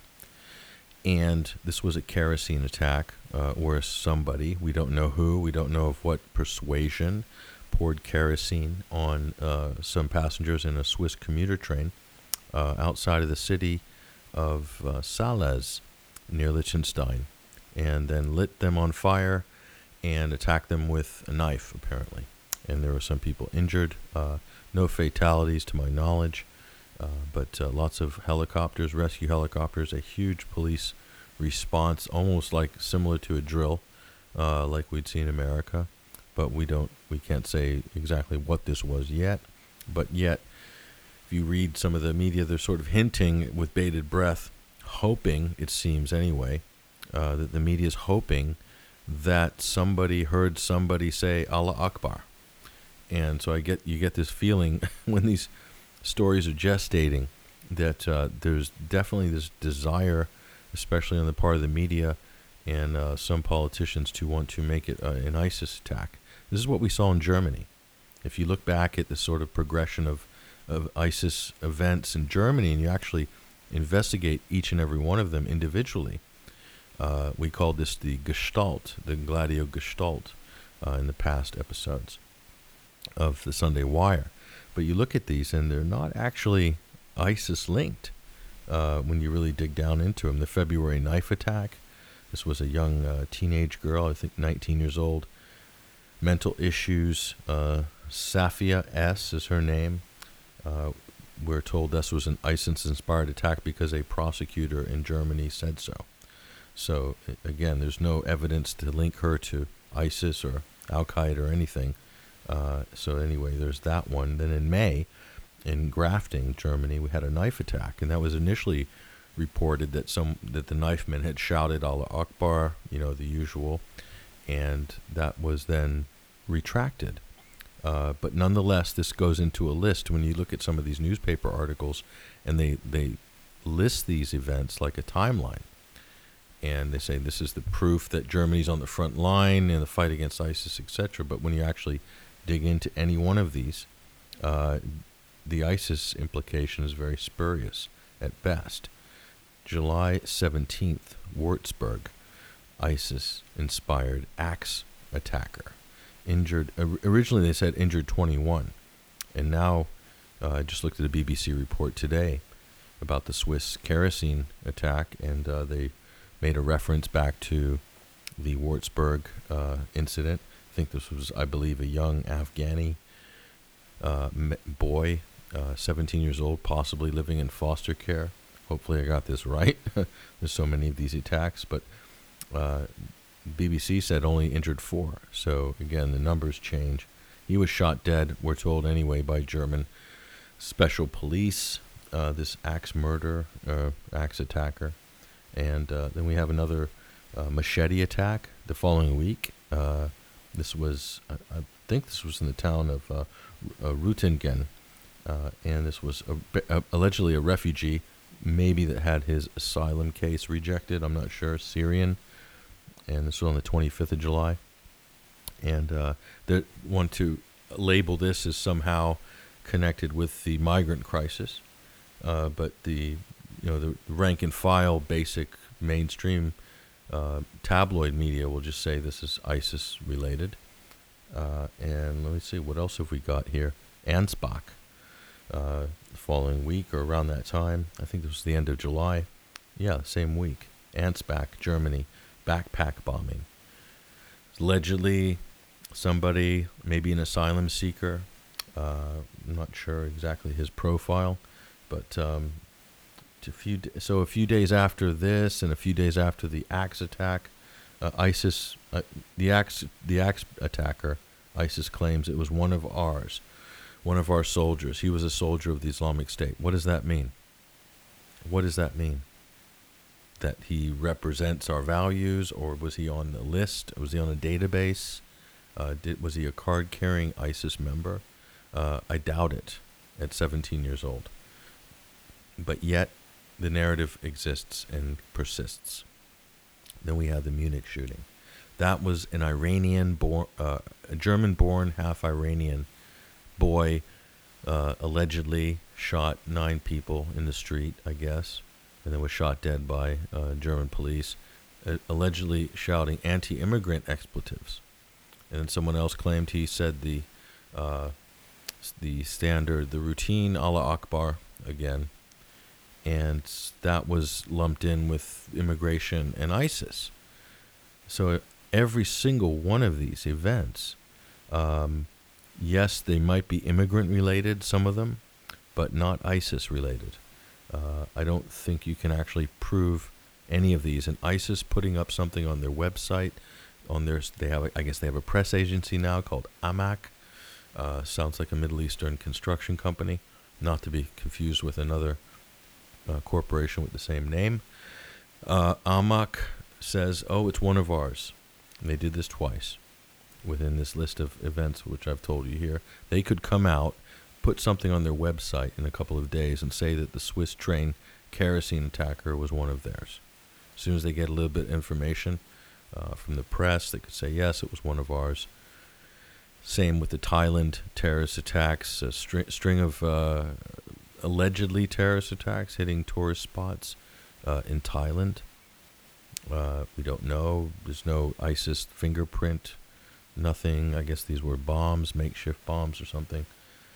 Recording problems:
hiss; faint; throughout; 25 dB below the speech

